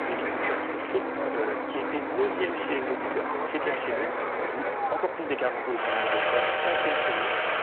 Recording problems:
phone-call audio
distortion; slight; 9% of the sound clipped
traffic noise; very loud; throughout; 4 dB above the speech
uneven, jittery; strongly; from 0.5 to 6 s

